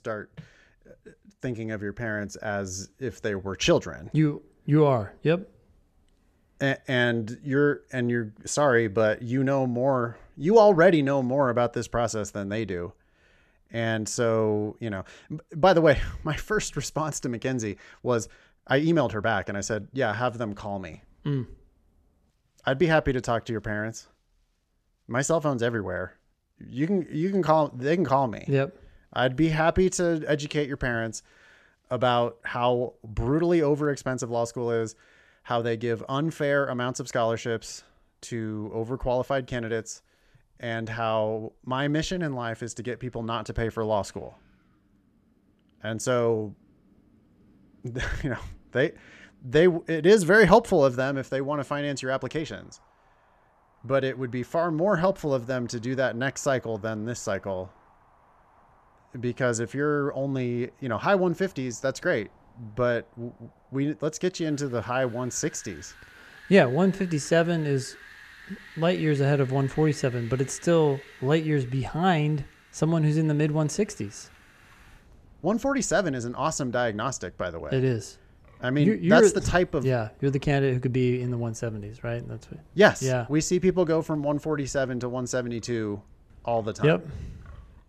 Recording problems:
wind in the background; faint; throughout; 25 dB below the speech

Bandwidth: 14 kHz